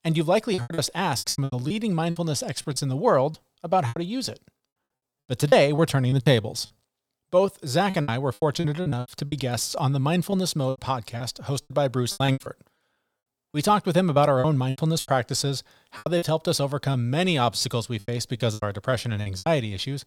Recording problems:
choppy; very; 13% of the speech affected

